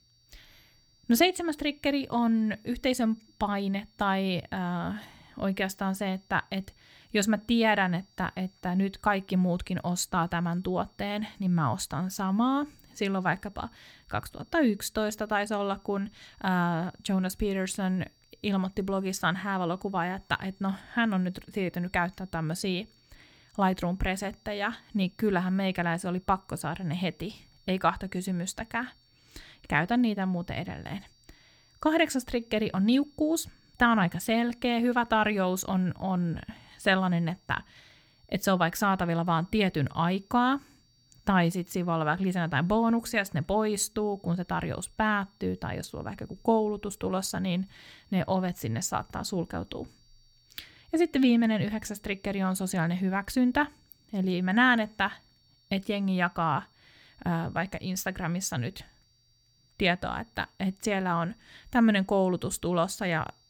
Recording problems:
high-pitched whine; faint; throughout; 4.5 kHz, 35 dB below the speech

